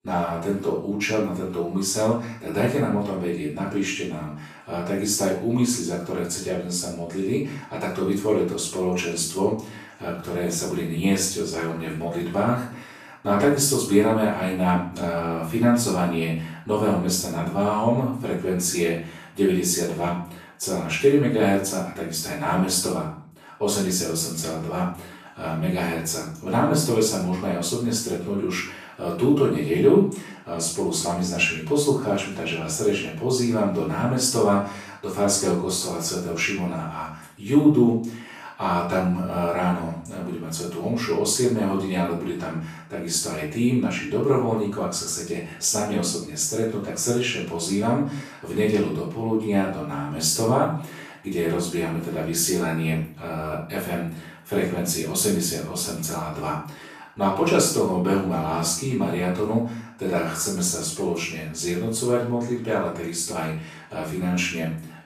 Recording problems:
off-mic speech; far
room echo; noticeable; dies away in 0.5 s

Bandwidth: 14.5 kHz